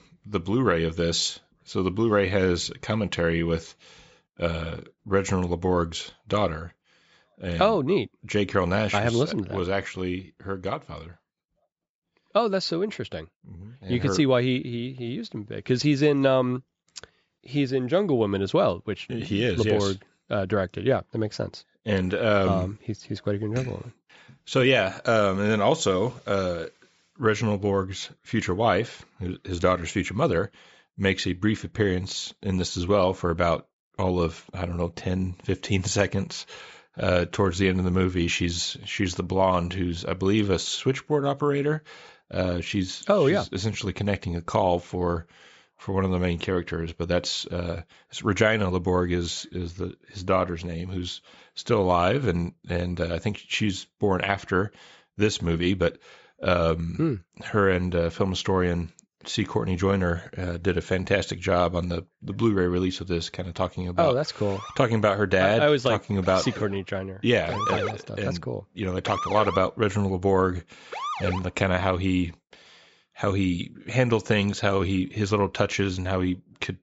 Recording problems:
high frequencies cut off; noticeable; nothing above 8 kHz
siren; noticeable; from 1:05 to 1:11; peak 2 dB below the speech

